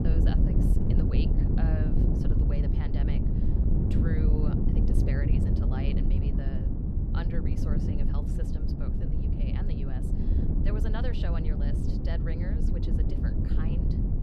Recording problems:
wind noise on the microphone; heavy; 4 dB above the speech

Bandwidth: 14.5 kHz